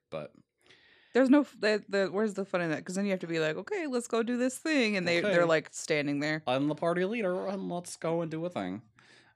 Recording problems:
none

